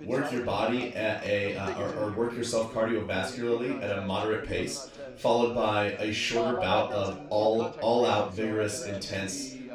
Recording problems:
off-mic speech; far
room echo; noticeable; dies away in 0.3 s
background chatter; noticeable; throughout; 2 voices, 10 dB below the speech

